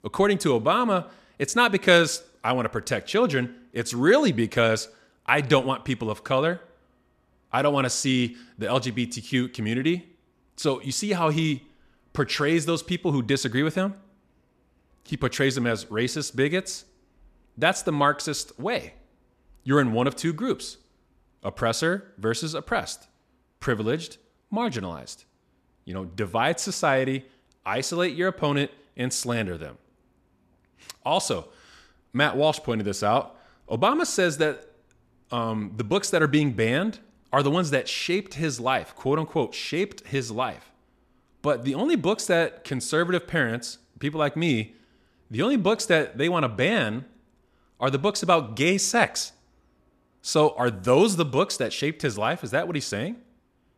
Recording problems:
none

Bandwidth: 14 kHz